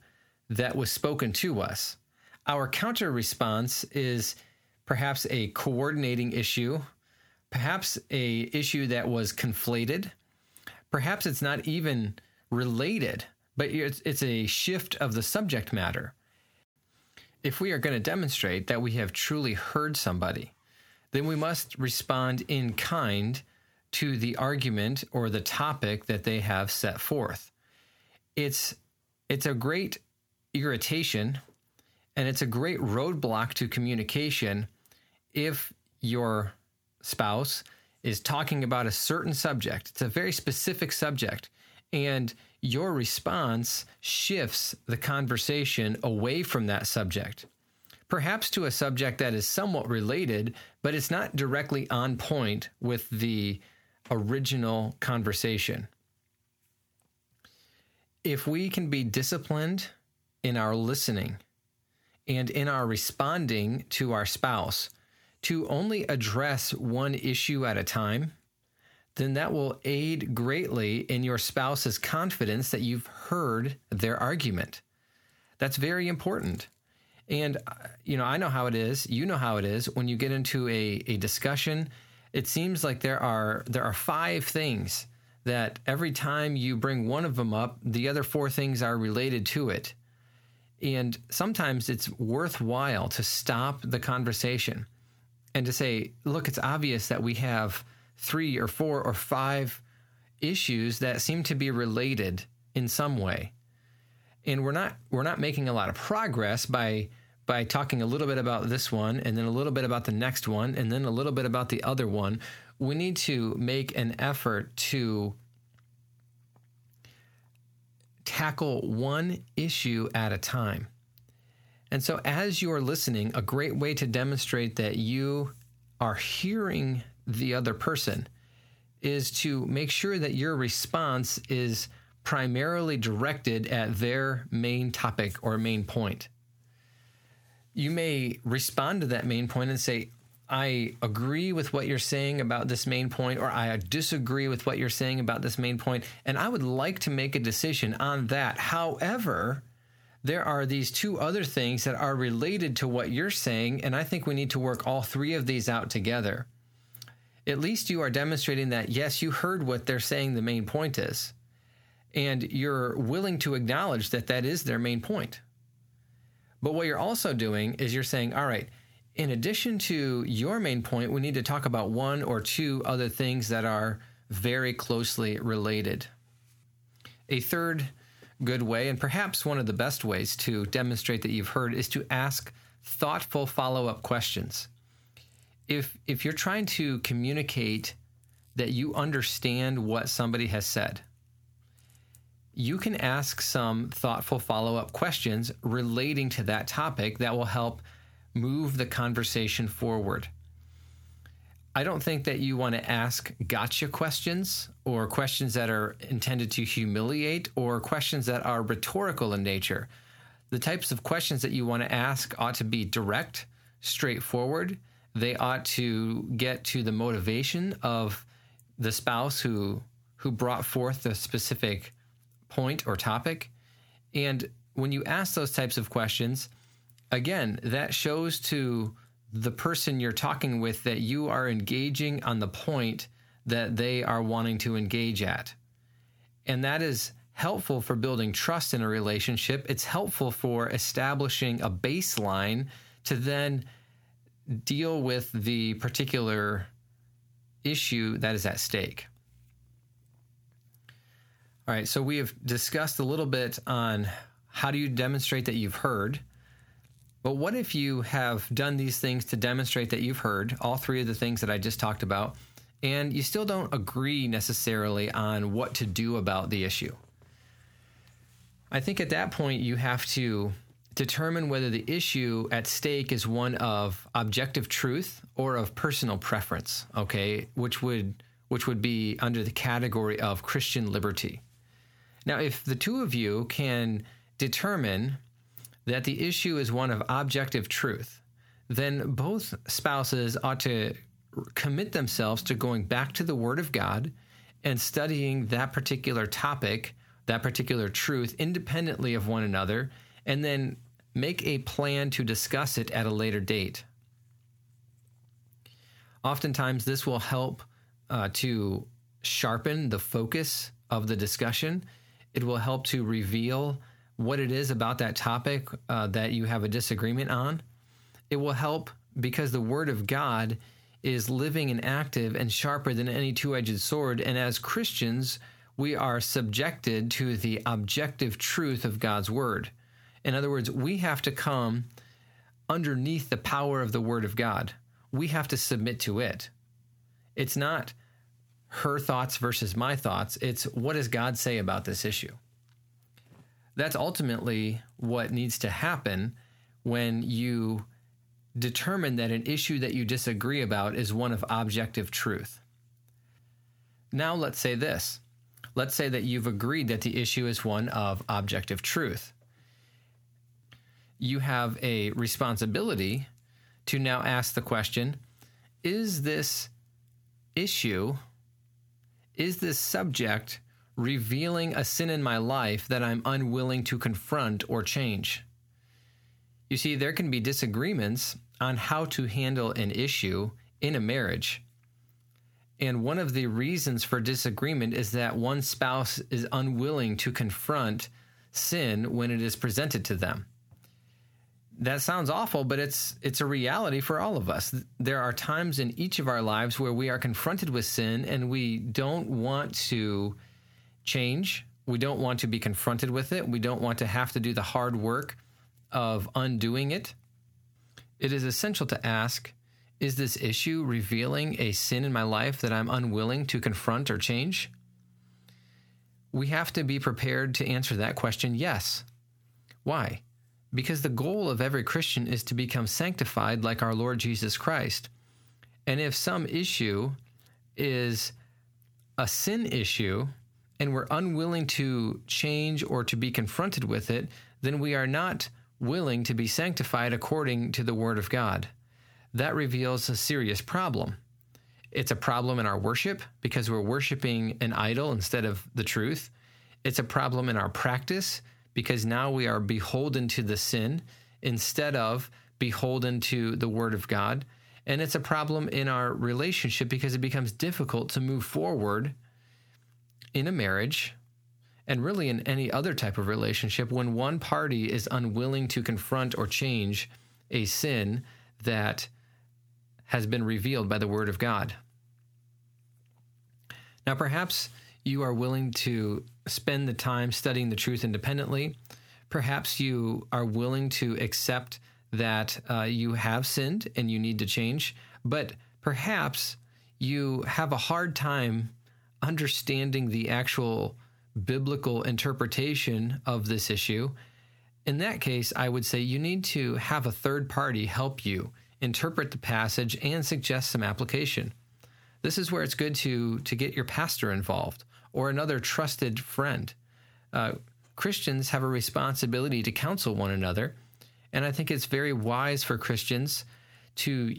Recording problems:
squashed, flat; heavily

